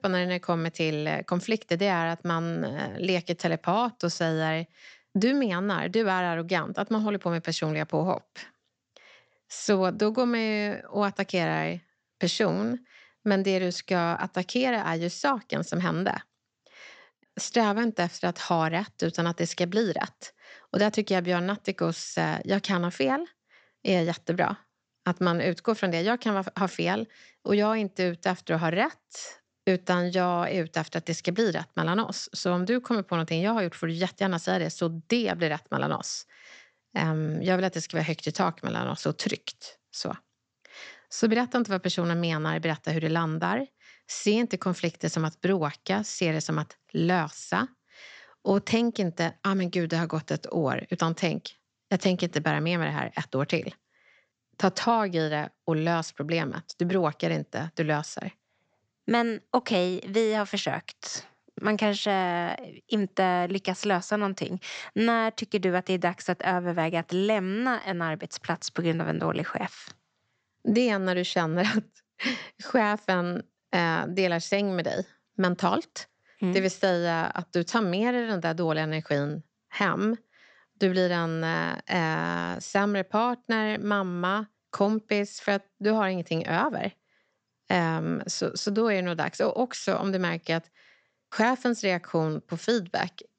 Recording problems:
high frequencies cut off; noticeable; nothing above 8 kHz

